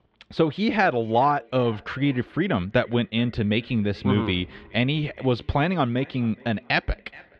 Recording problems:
muffled; slightly; fading above 3.5 kHz
echo of what is said; faint; throughout; 420 ms later, 25 dB below the speech

